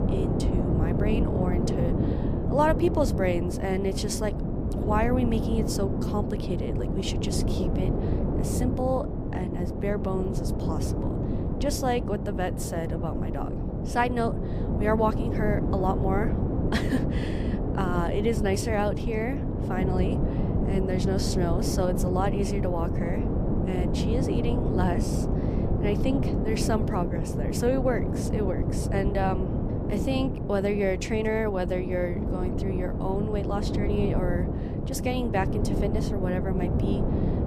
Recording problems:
wind noise on the microphone; heavy; 4 dB below the speech

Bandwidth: 15 kHz